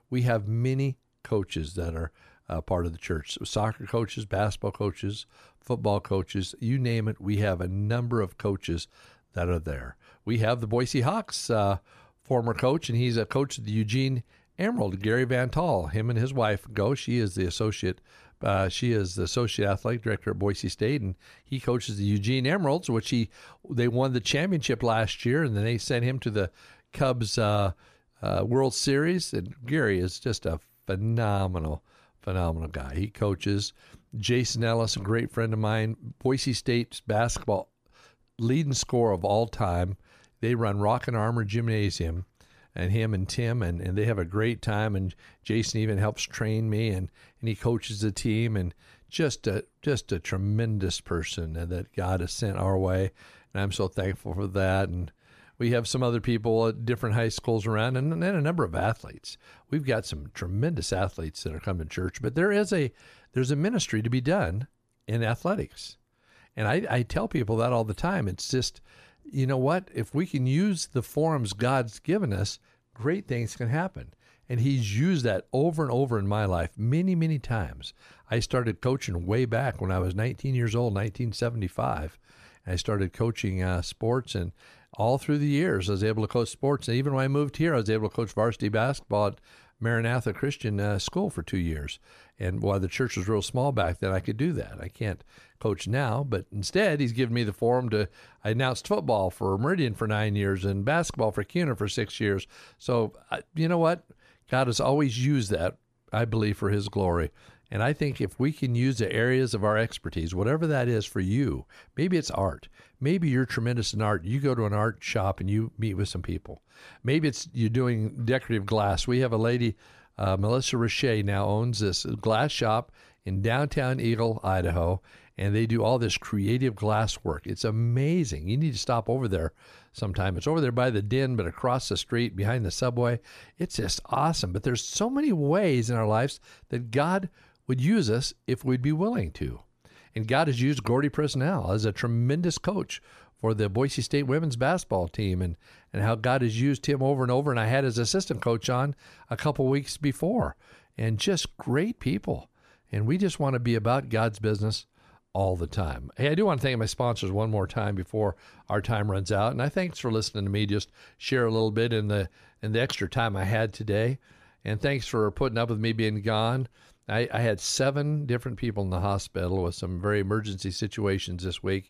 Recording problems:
none

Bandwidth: 14.5 kHz